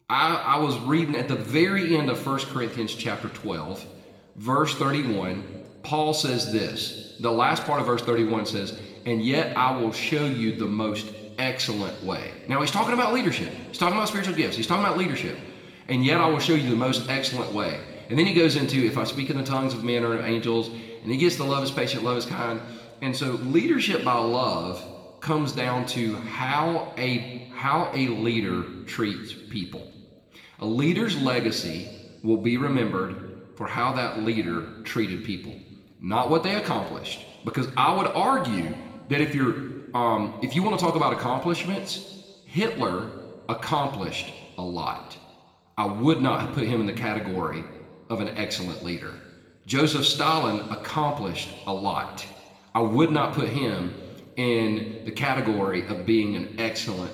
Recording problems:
room echo; slight; dies away in 1.4 s
off-mic speech; somewhat distant

